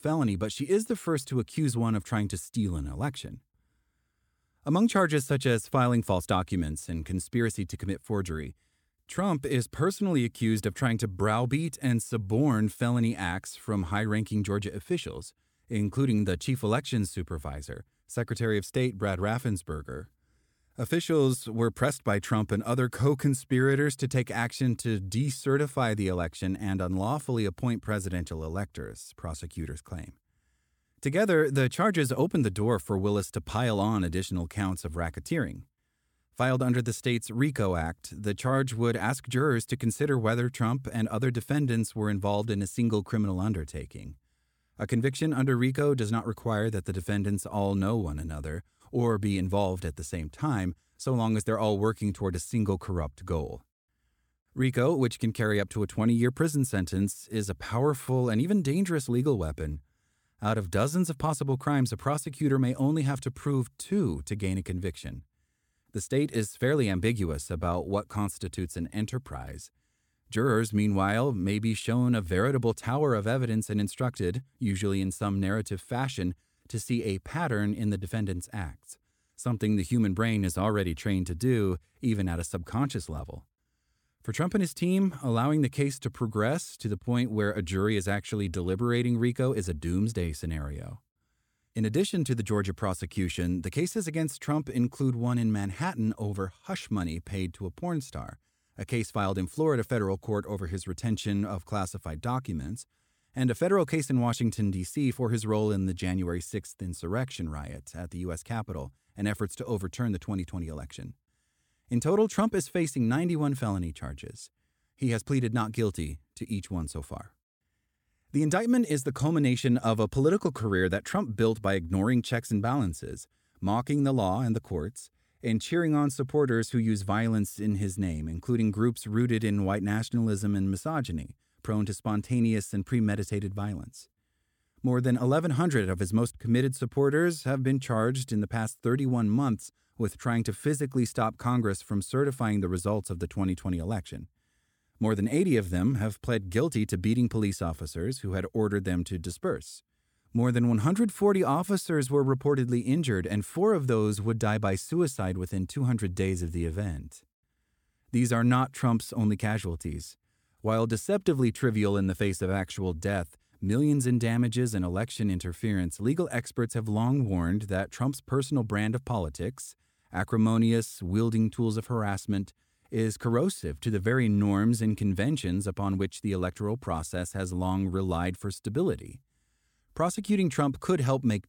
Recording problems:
none

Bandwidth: 17 kHz